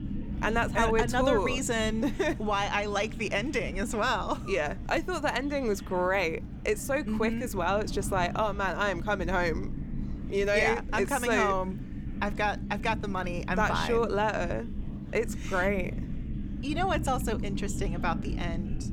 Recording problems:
low rumble; noticeable; throughout; 15 dB below the speech
murmuring crowd; faint; throughout; 25 dB below the speech

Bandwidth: 17.5 kHz